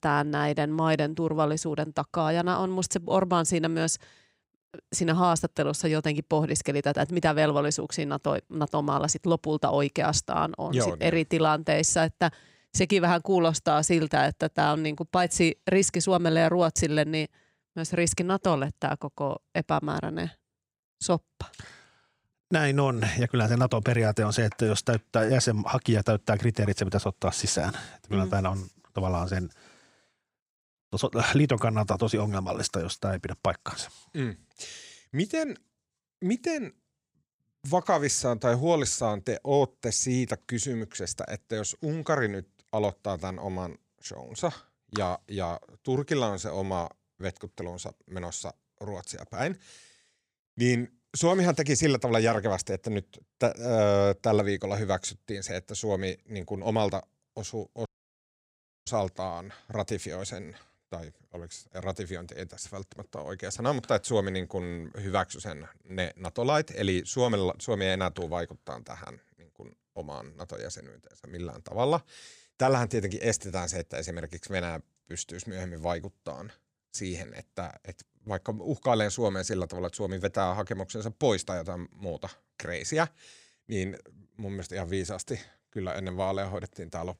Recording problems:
audio cutting out; at 58 s for 1 s

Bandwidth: 15.5 kHz